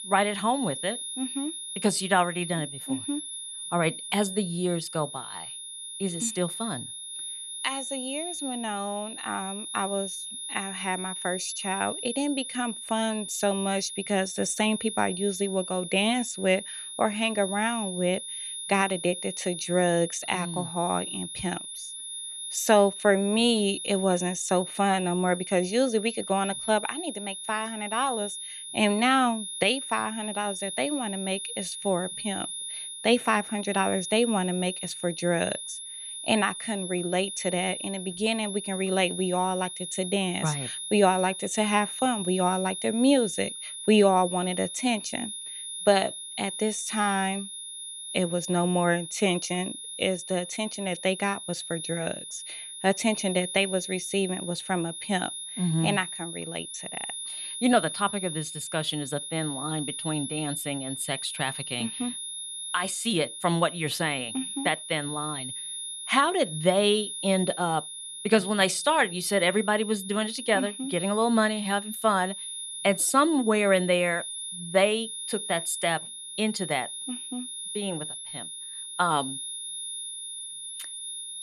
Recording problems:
high-pitched whine; loud; throughout; 10.5 kHz, 7 dB below the speech

